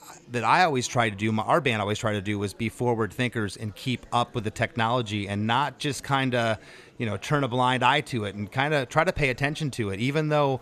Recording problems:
murmuring crowd; faint; throughout; 30 dB below the speech

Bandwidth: 14.5 kHz